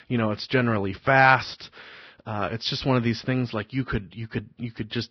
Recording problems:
garbled, watery; badly; nothing above 5.5 kHz

